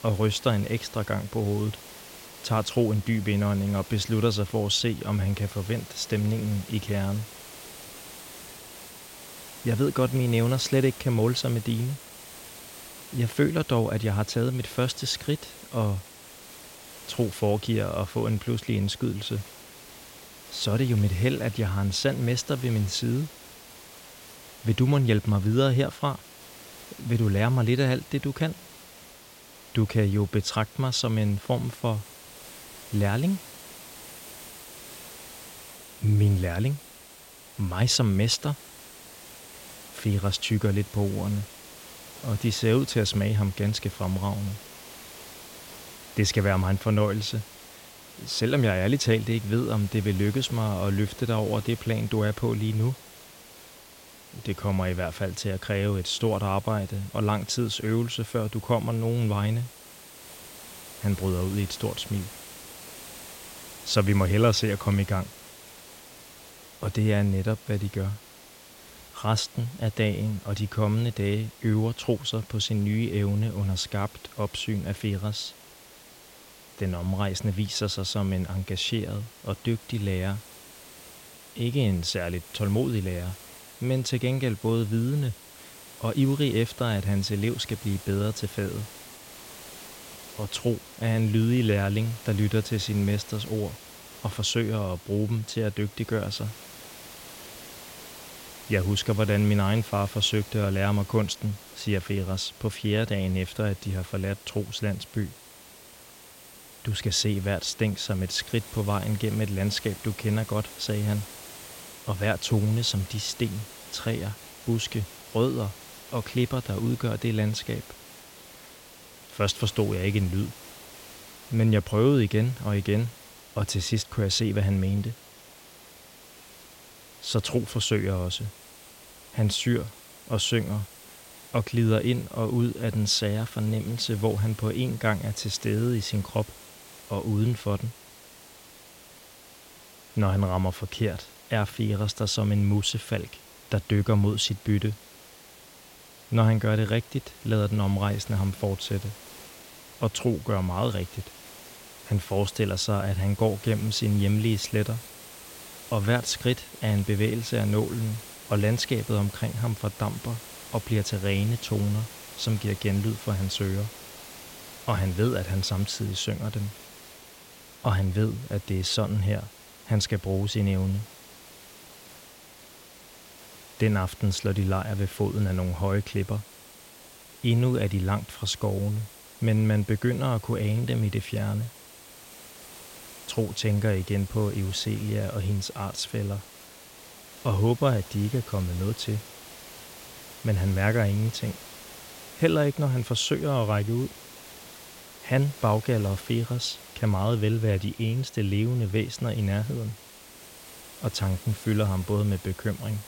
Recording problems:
hiss; noticeable; throughout; 15 dB below the speech

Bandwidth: 16.5 kHz